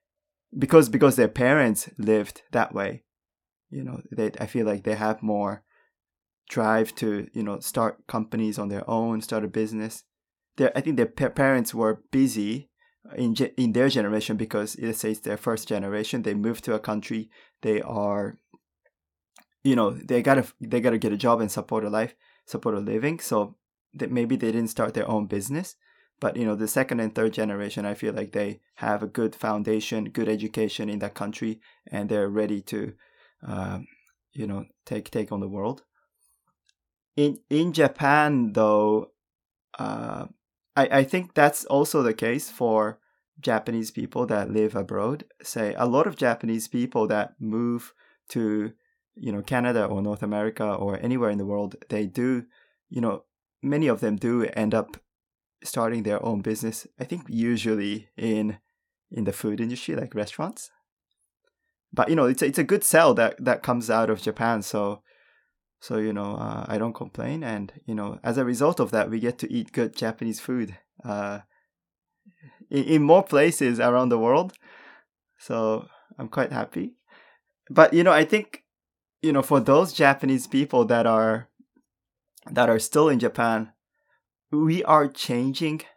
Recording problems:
none

